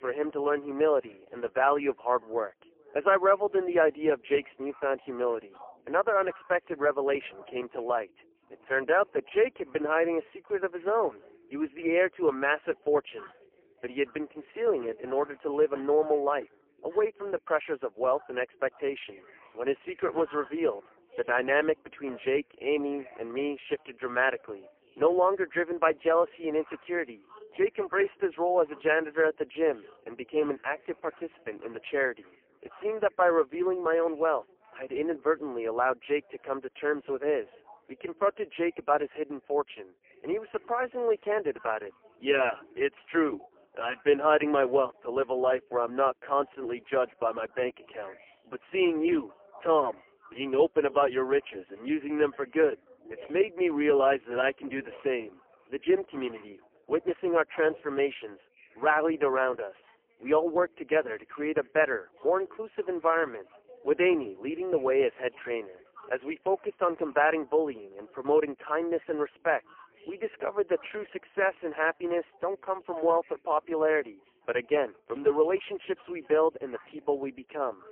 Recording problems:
phone-call audio; poor line; nothing above 3 kHz
background chatter; faint; throughout; 4 voices, 25 dB below the speech

